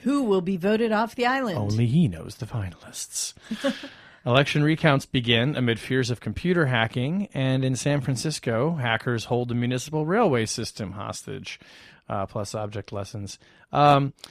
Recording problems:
none

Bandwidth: 14.5 kHz